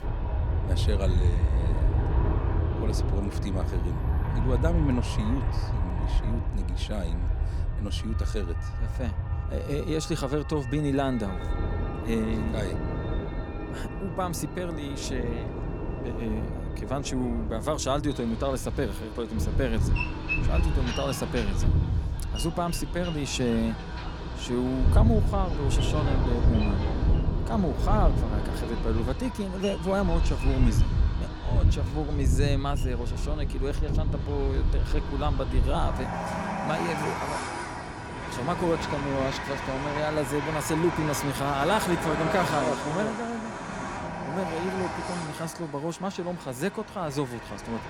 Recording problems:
train or aircraft noise; very loud; throughout; 1 dB above the speech
background music; noticeable; until 21 s; 15 dB below the speech

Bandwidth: 18 kHz